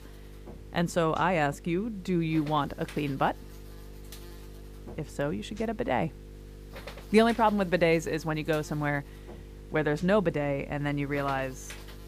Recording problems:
electrical hum; faint; throughout; 50 Hz, 20 dB below the speech

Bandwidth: 15 kHz